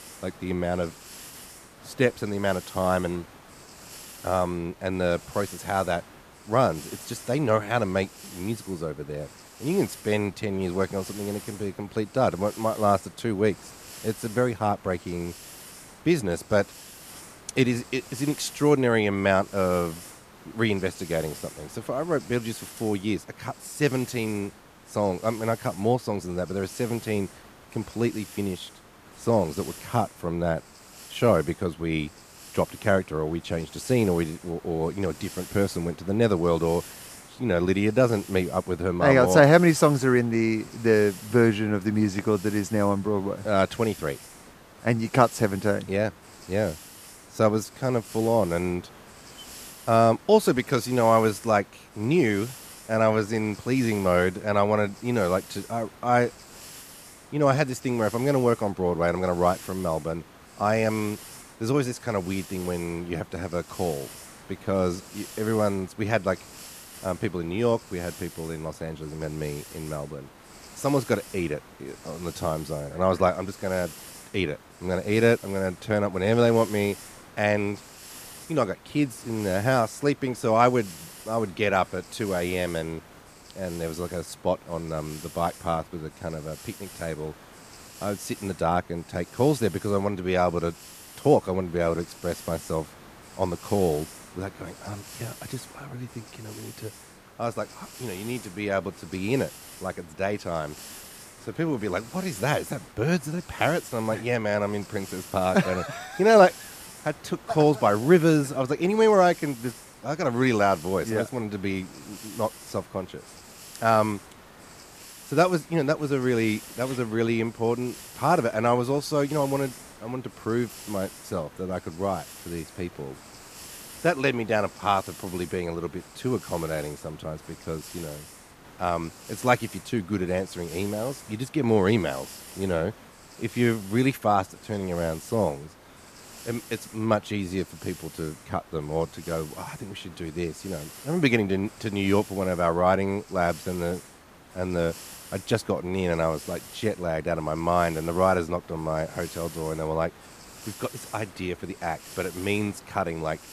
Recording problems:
hiss; noticeable; throughout; 20 dB below the speech

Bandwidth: 14.5 kHz